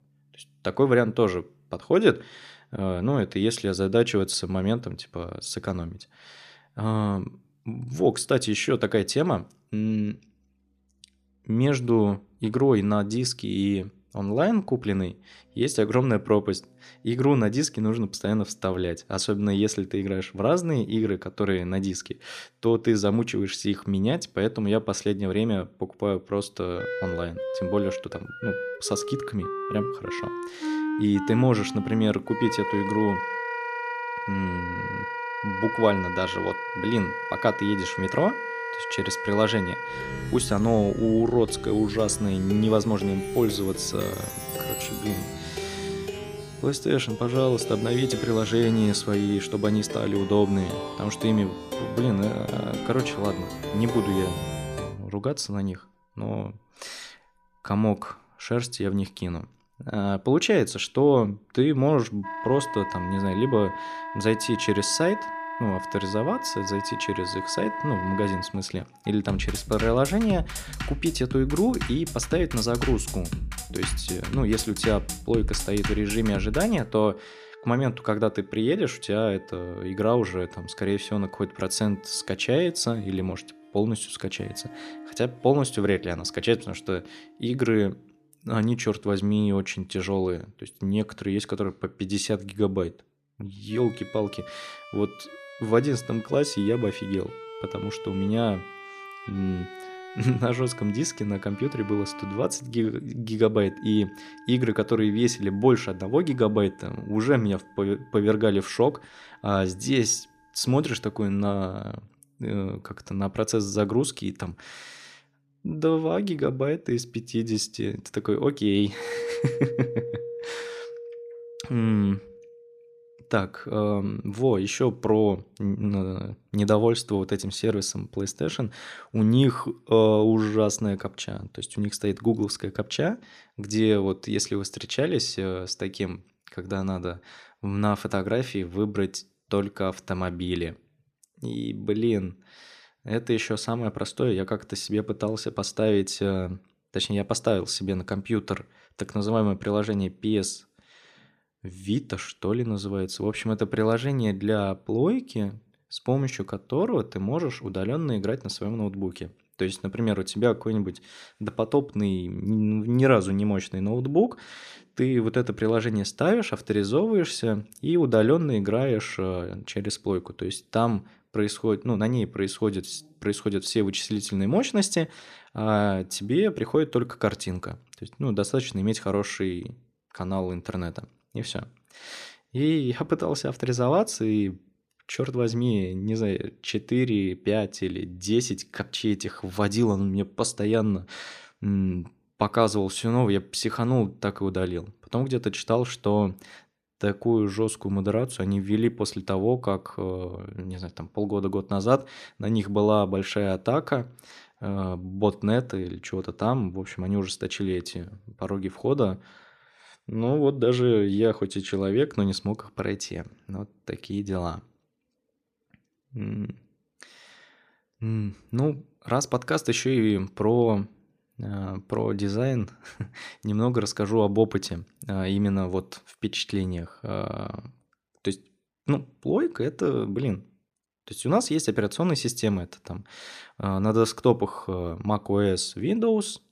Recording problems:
background music; loud; until 2:05; 8 dB below the speech

